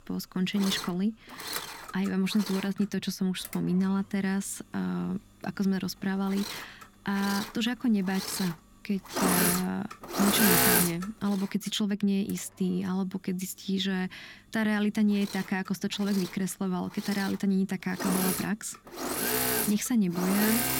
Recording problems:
machinery noise; very loud; throughout; as loud as the speech

